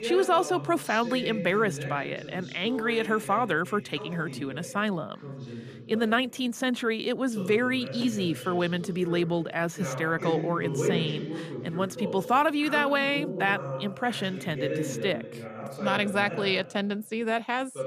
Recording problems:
voice in the background; loud; throughout; 9 dB below the speech

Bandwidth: 15 kHz